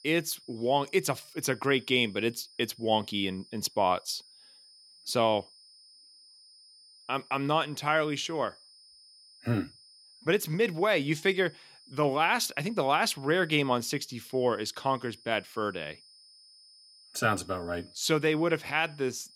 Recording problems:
high-pitched whine; faint; throughout; 5 kHz, 25 dB below the speech

